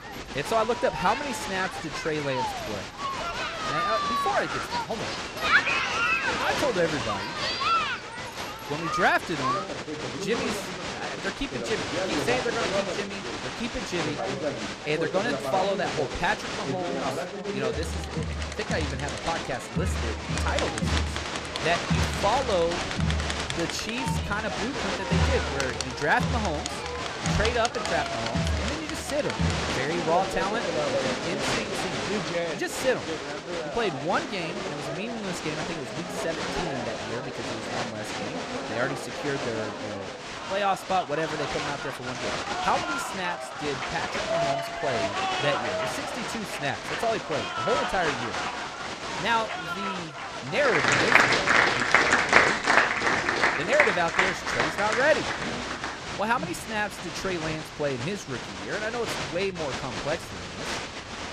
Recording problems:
crowd noise; very loud; throughout; 2 dB above the speech

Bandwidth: 14 kHz